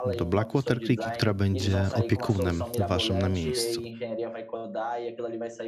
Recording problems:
voice in the background; loud; throughout; 6 dB below the speech

